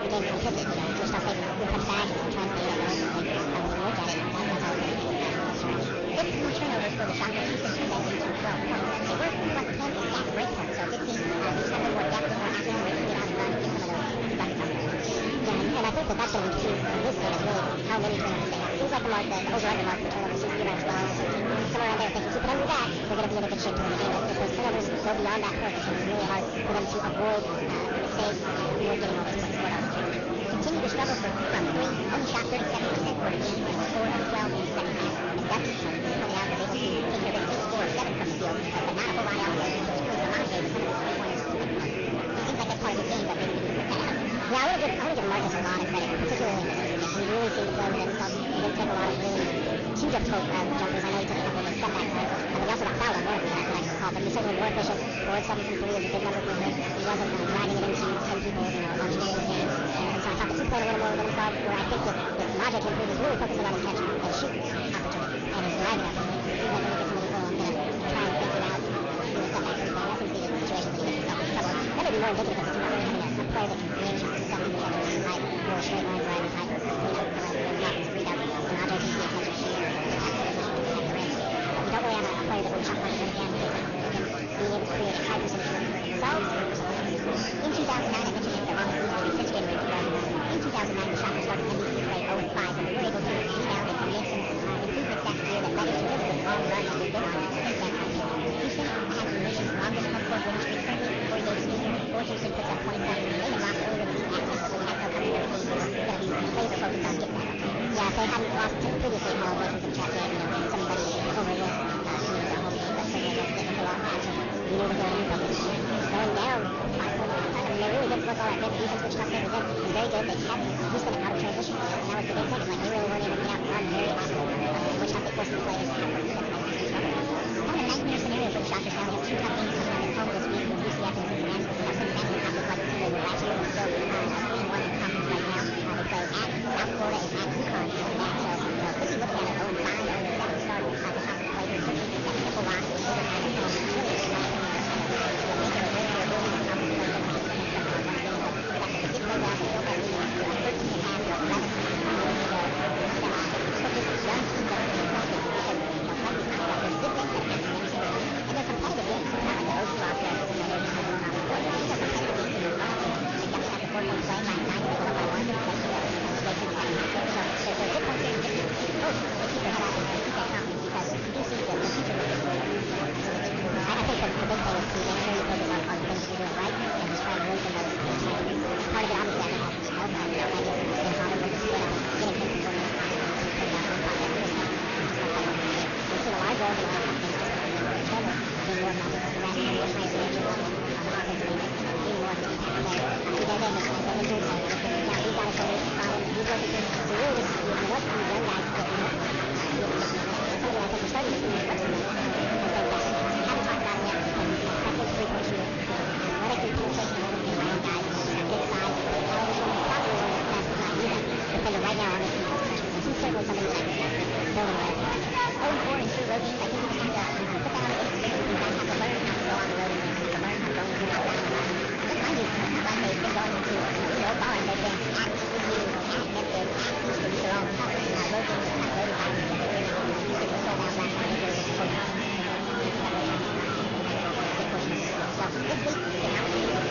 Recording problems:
wrong speed and pitch; too fast and too high; 1.6 times normal speed
distortion; slight; 16% of the sound clipped
garbled, watery; slightly; nothing above 6.5 kHz
murmuring crowd; very loud; throughout; 3 dB above the speech

